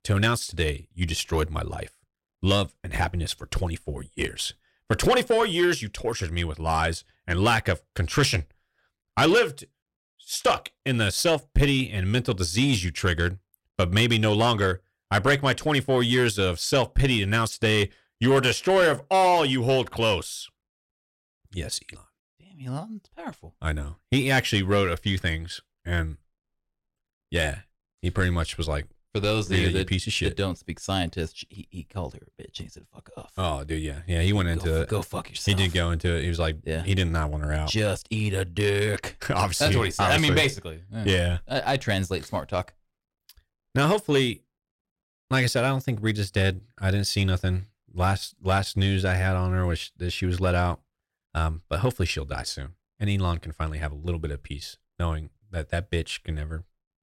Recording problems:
distortion; slight; 10 dB below the speech

